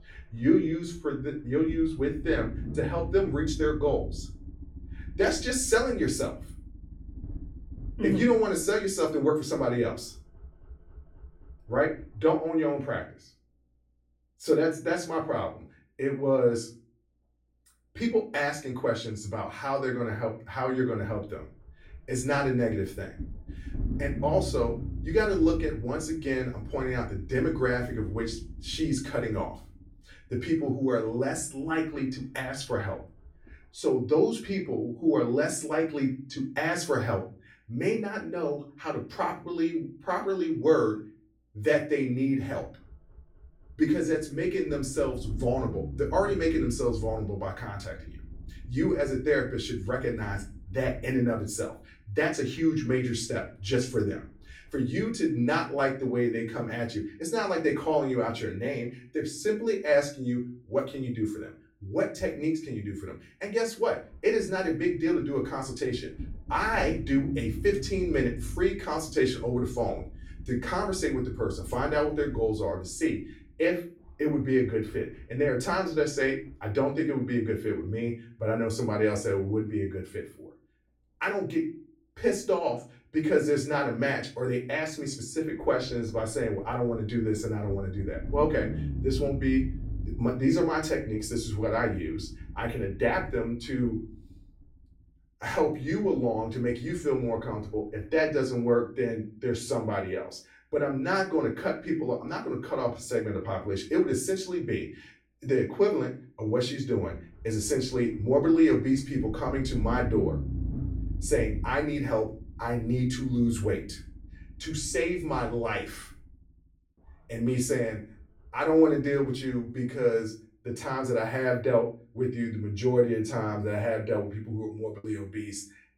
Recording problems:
off-mic speech; far
room echo; slight; dies away in 0.3 s
low rumble; faint; throughout; 20 dB below the speech
choppy; very; at 2:05; 6% of the speech affected

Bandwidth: 16.5 kHz